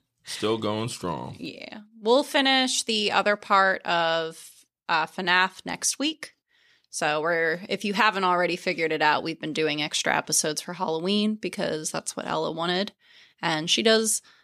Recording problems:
none

